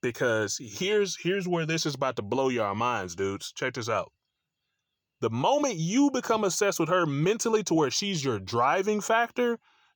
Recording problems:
none

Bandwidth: 18.5 kHz